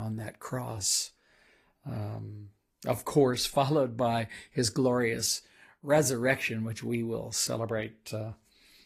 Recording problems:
garbled, watery; slightly; nothing above 14.5 kHz
abrupt cut into speech; at the start

